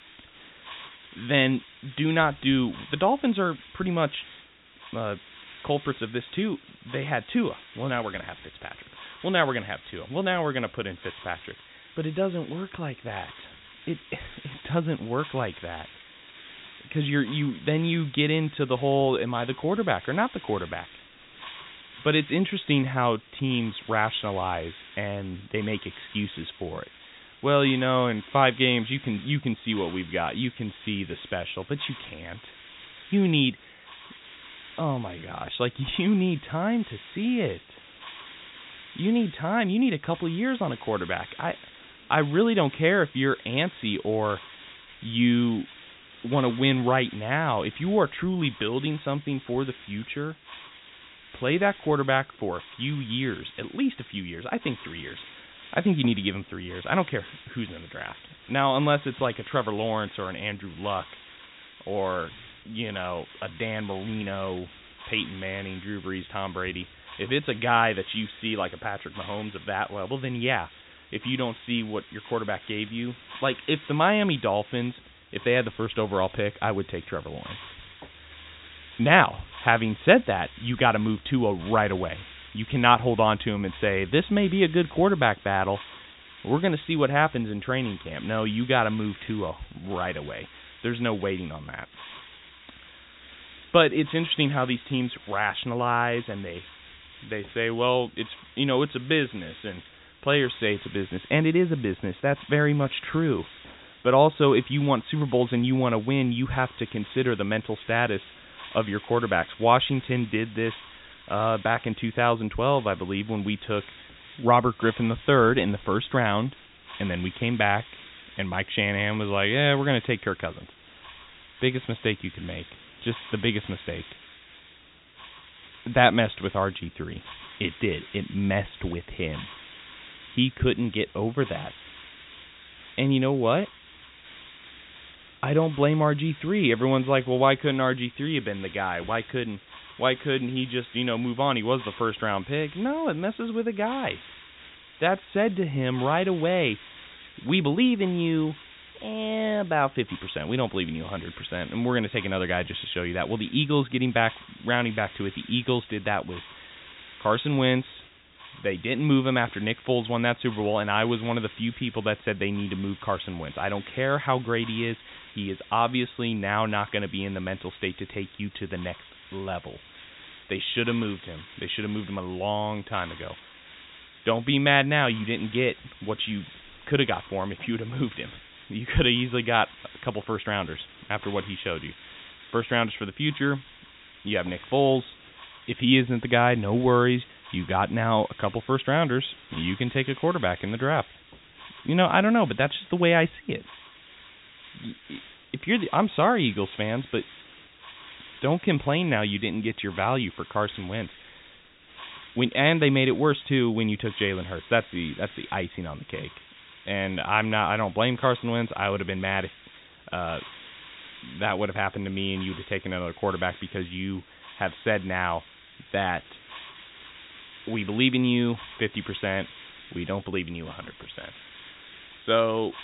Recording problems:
high frequencies cut off; severe; nothing above 4 kHz
hiss; noticeable; throughout; 20 dB below the speech

